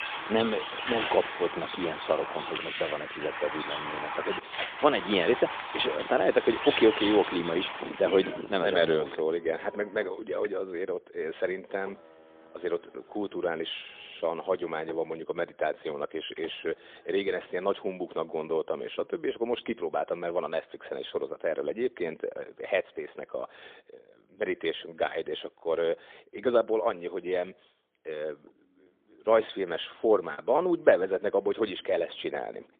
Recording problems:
phone-call audio; poor line
traffic noise; loud; throughout; 6 dB below the speech
choppy; occasionally; from 29 to 31 s; 4% of the speech affected

